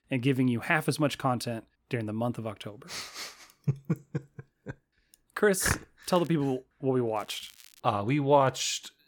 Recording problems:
crackling; faint; at 6 s and at 7 s; 25 dB below the speech

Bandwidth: 18 kHz